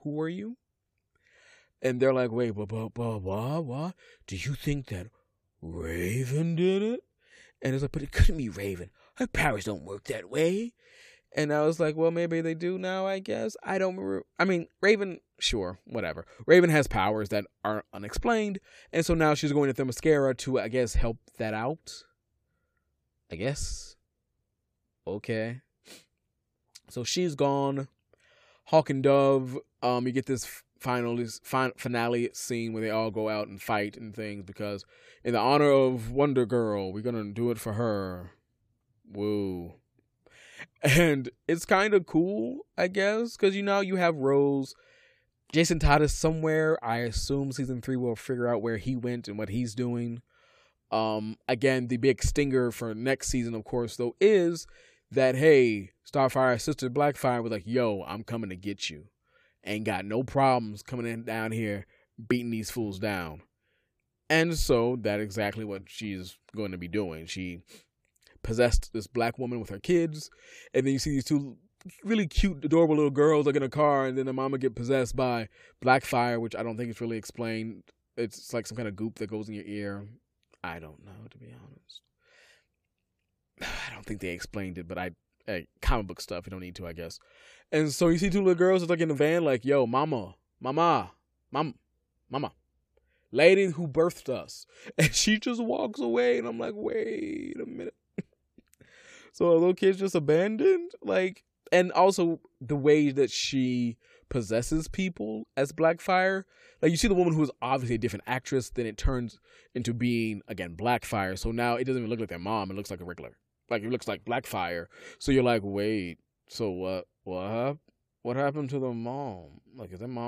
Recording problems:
abrupt cut into speech; at the end

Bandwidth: 15 kHz